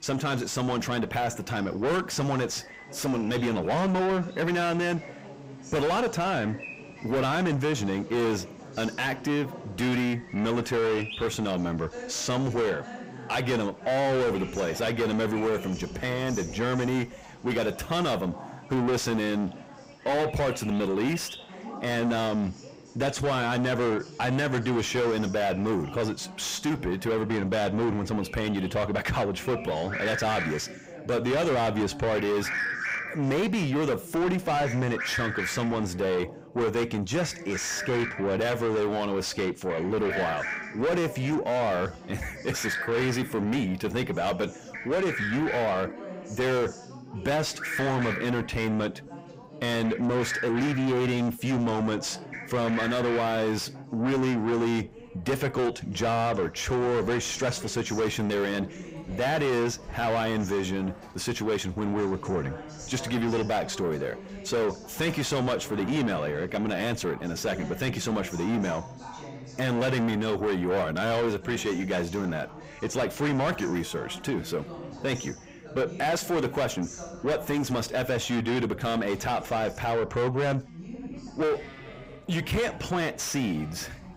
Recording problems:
distortion; heavy; 5 dB below the speech
animal sounds; loud; throughout; 8 dB below the speech
background chatter; noticeable; throughout; 3 voices, 15 dB below the speech

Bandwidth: 15.5 kHz